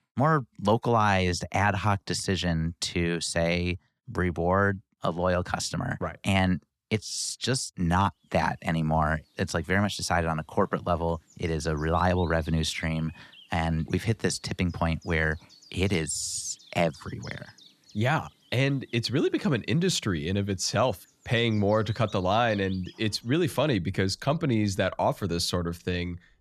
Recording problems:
animal sounds; faint; from 8.5 s on; 25 dB below the speech

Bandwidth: 13.5 kHz